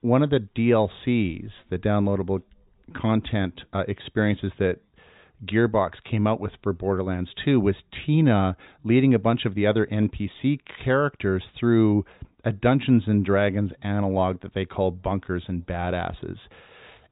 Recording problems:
high frequencies cut off; severe; nothing above 4 kHz

